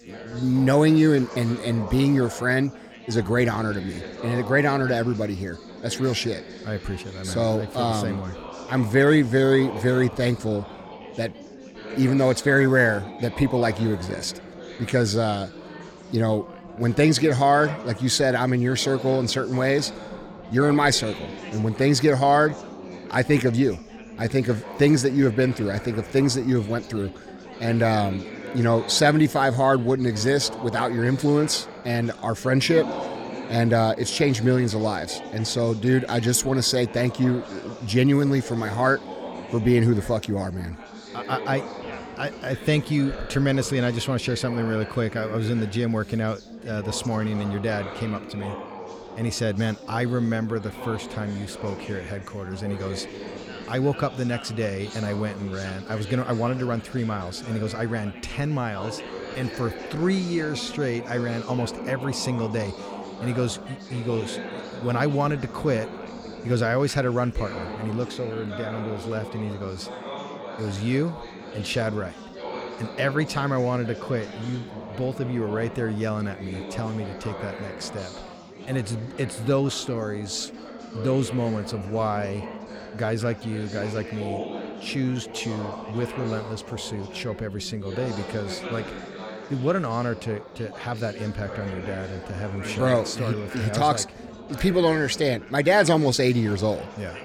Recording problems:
chatter from many people; noticeable; throughout; 15 dB below the speech

